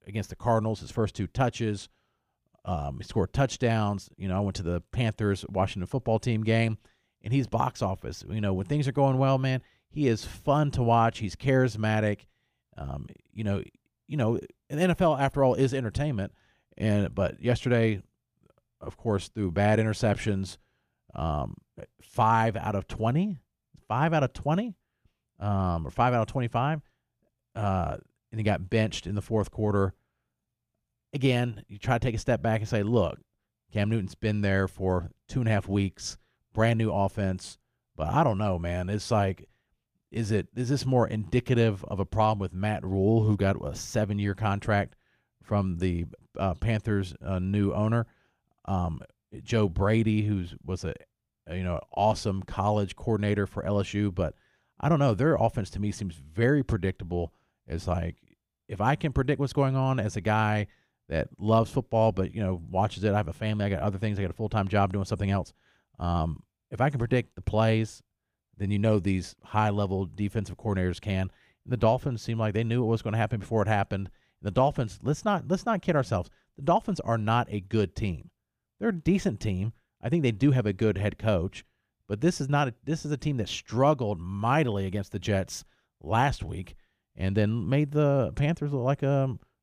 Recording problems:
none

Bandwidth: 15 kHz